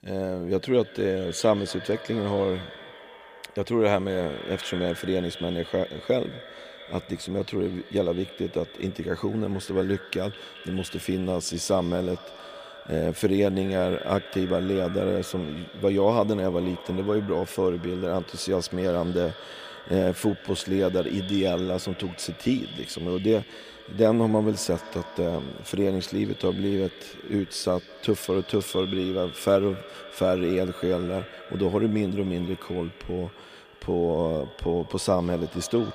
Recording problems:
echo of what is said; noticeable; throughout; 210 ms later, 15 dB below the speech

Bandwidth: 15 kHz